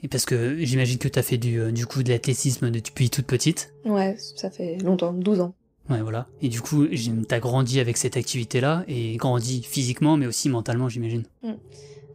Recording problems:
low rumble; faint; throughout; 25 dB below the speech

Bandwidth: 15.5 kHz